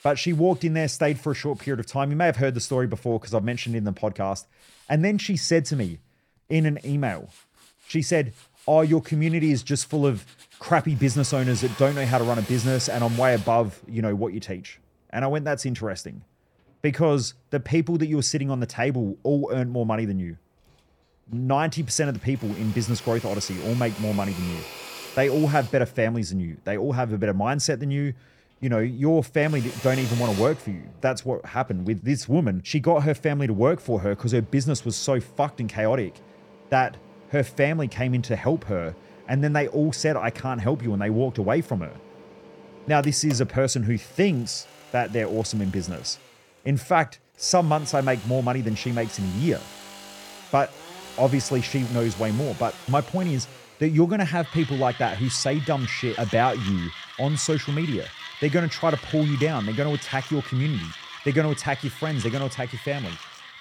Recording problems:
machinery noise; noticeable; throughout; 15 dB below the speech

